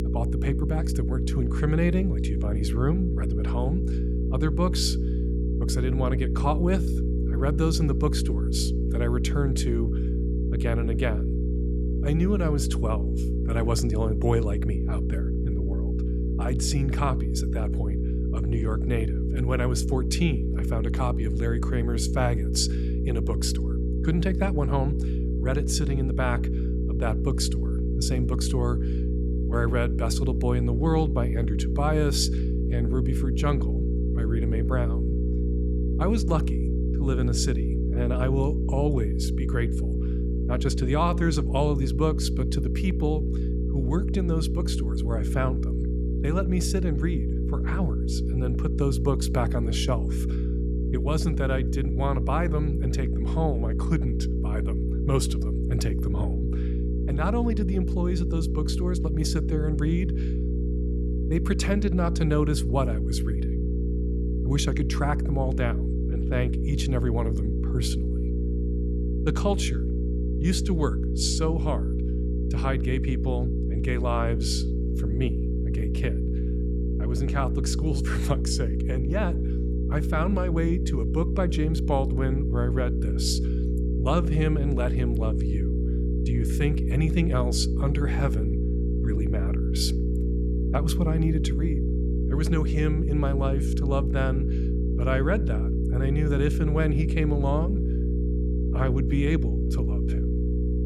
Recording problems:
electrical hum; loud; throughout; 60 Hz, 5 dB below the speech

